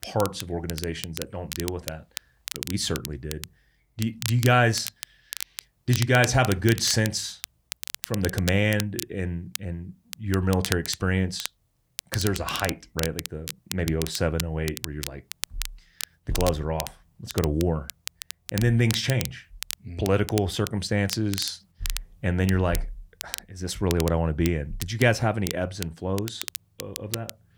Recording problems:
crackle, like an old record; loud; 10 dB below the speech

